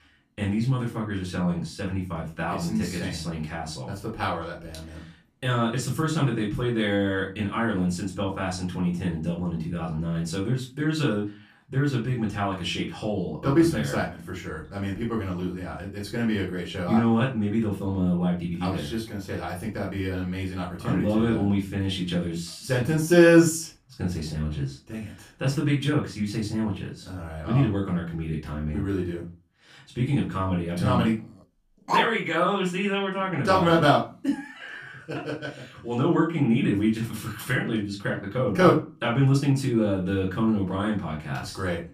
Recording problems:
off-mic speech; far
room echo; slight; dies away in 0.3 s
dog barking; loud; at 32 s; peak level with the speech

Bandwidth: 15 kHz